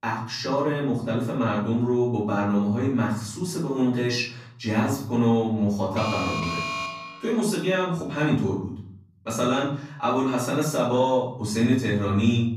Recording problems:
off-mic speech; far
room echo; noticeable; dies away in 0.7 s
alarm; noticeable; from 6 to 7.5 s; peak 3 dB below the speech

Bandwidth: 15 kHz